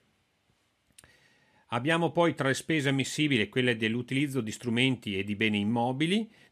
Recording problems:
none

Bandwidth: 14.5 kHz